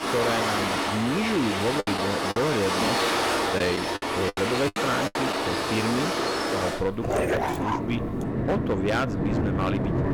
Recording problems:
distortion; slight; 12% of the sound clipped
rain or running water; very loud; throughout; 2 dB above the speech
choppy; very; from 2 to 5.5 s; 13% of the speech affected
dog barking; loud; from 7 to 8.5 s; peak 4 dB above the speech

